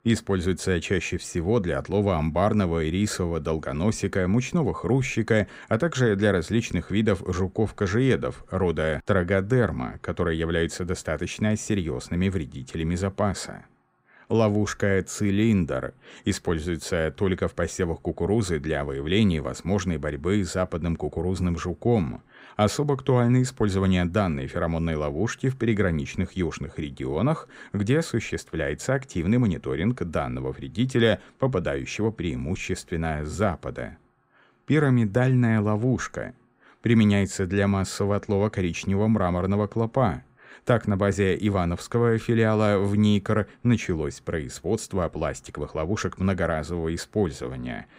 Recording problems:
none

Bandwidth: 15.5 kHz